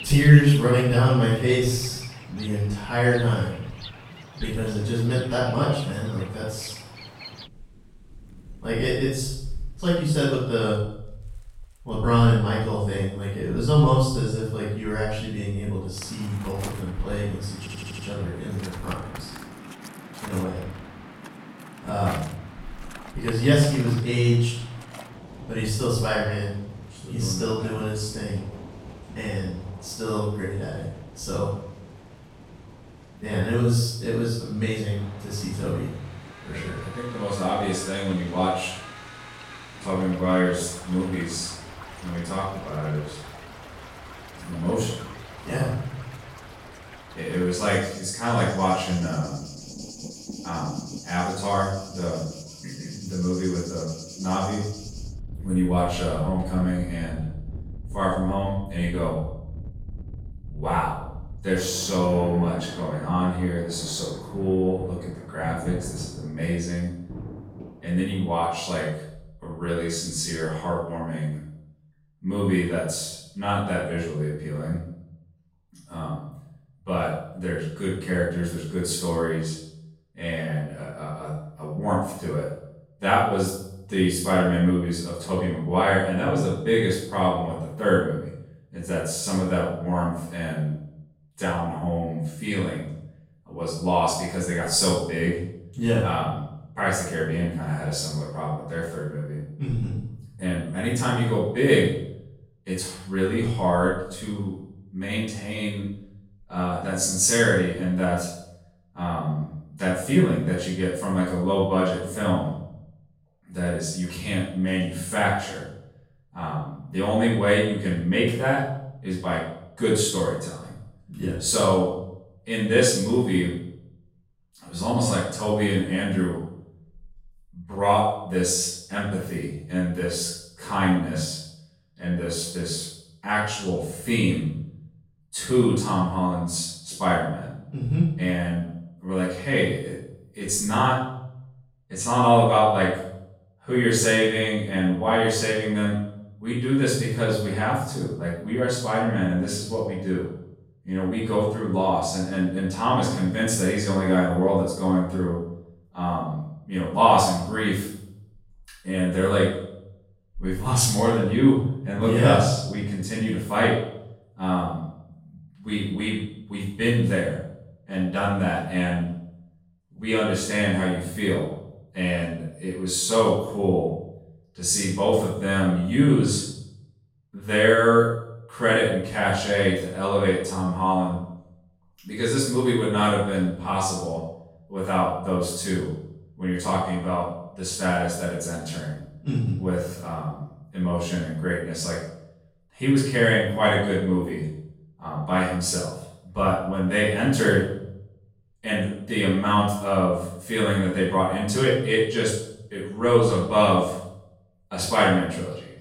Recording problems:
off-mic speech; far
room echo; noticeable; dies away in 0.6 s
rain or running water; noticeable; until 1:09; 15 dB below the speech
audio stuttering; at 18 s

